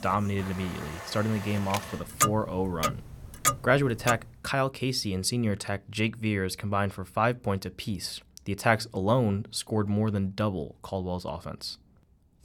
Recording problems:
household noises; loud; until 4.5 s; 3 dB below the speech

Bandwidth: 18 kHz